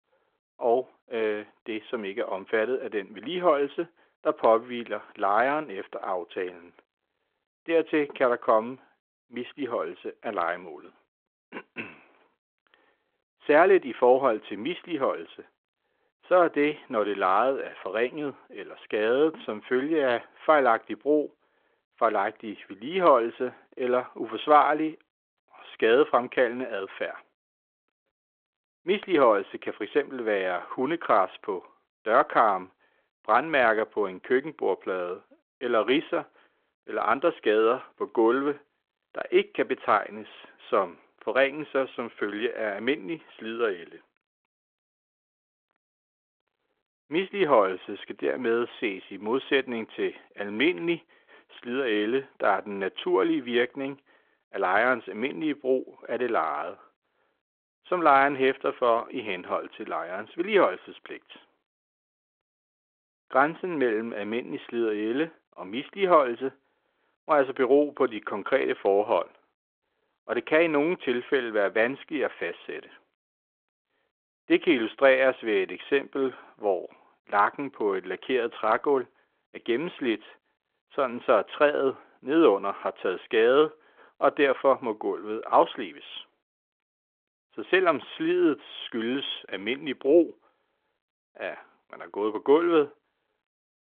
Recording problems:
phone-call audio

